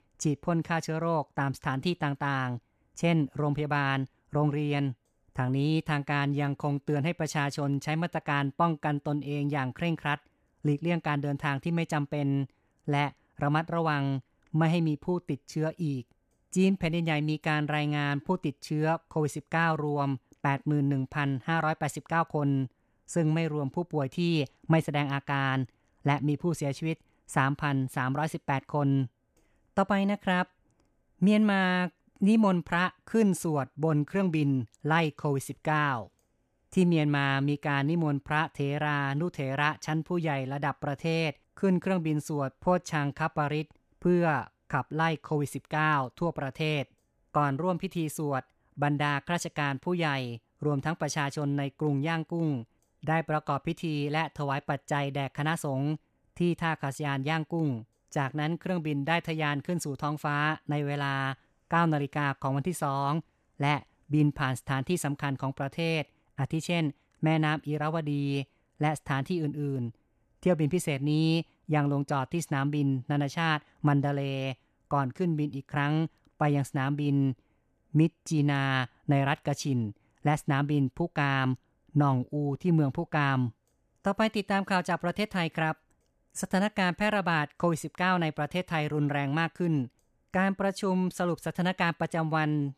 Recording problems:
none

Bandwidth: 14.5 kHz